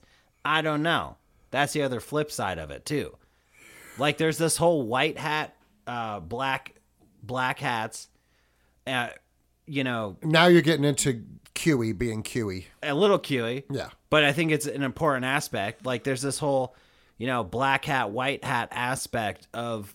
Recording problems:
none

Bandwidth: 16.5 kHz